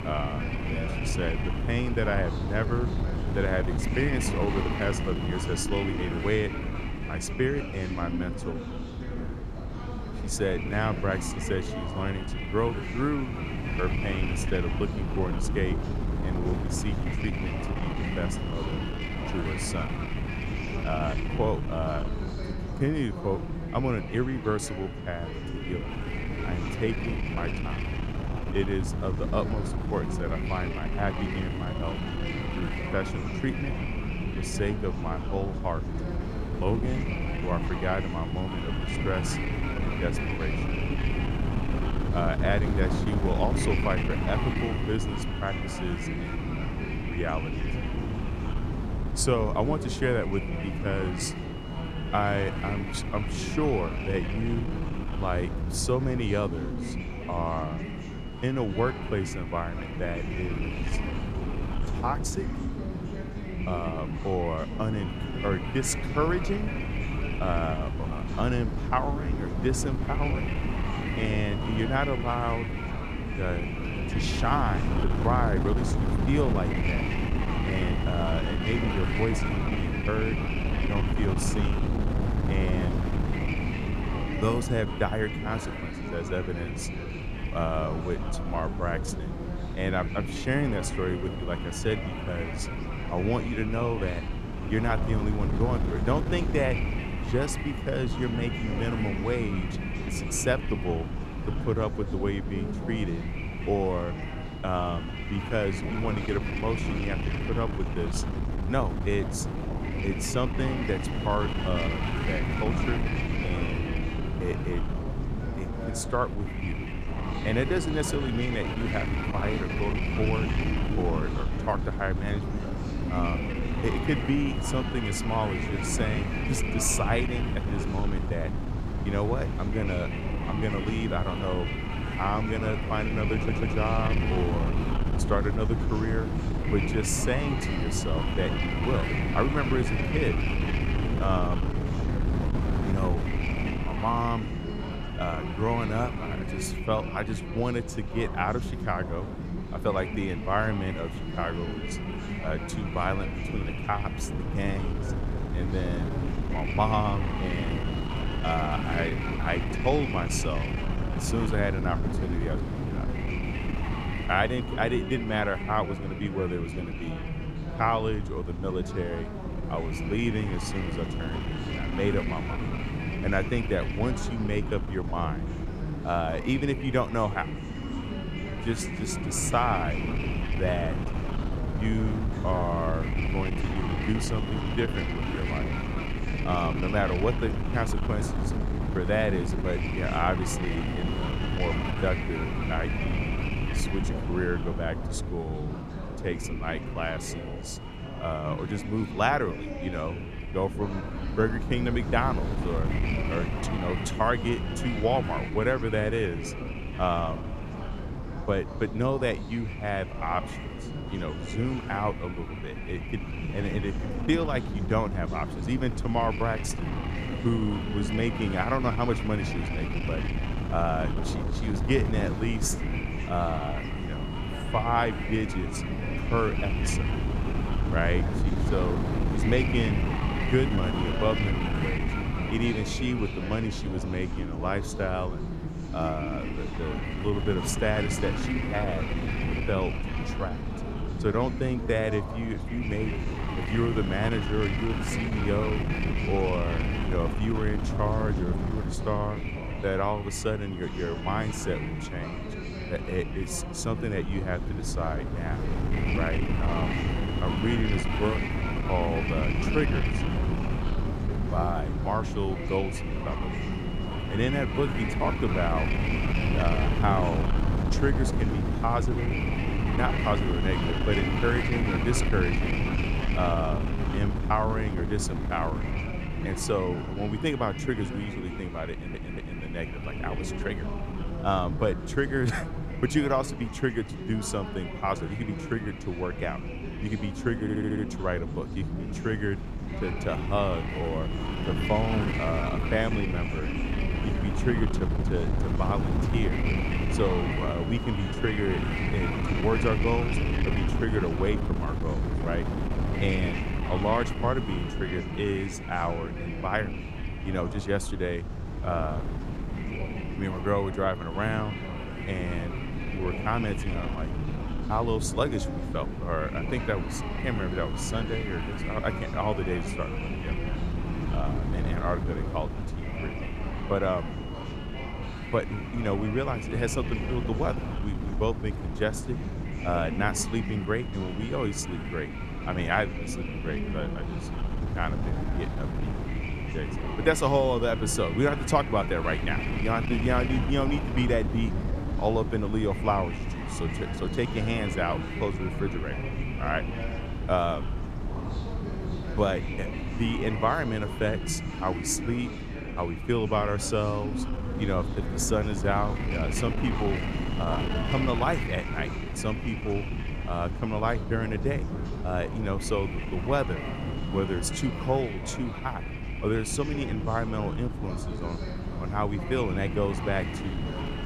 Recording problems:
wind noise on the microphone; heavy; 5 dB below the speech
background chatter; loud; throughout; 2 voices, 9 dB below the speech
audio stuttering; at 2:13, at 4:39 and at 4:48

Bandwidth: 14 kHz